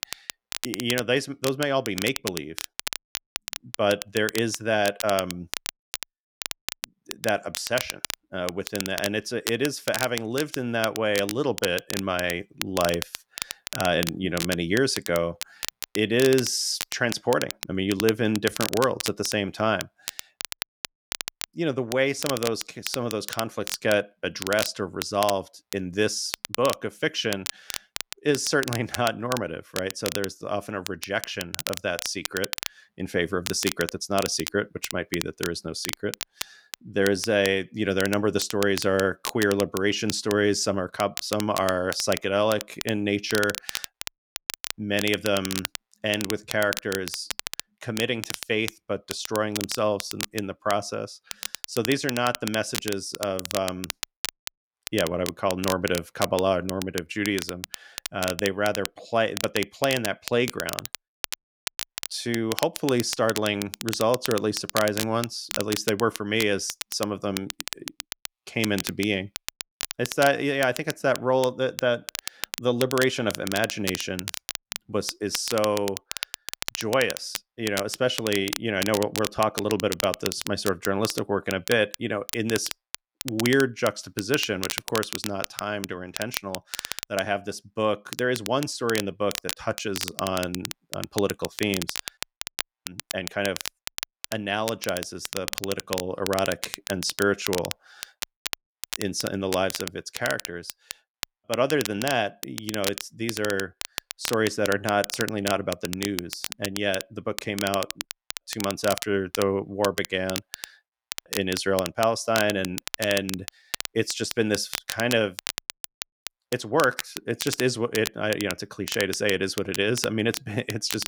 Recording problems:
crackle, like an old record; loud; 7 dB below the speech

